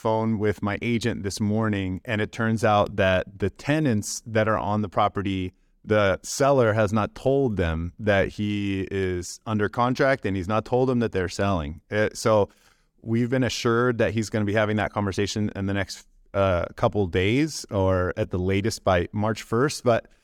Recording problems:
none

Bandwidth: 18 kHz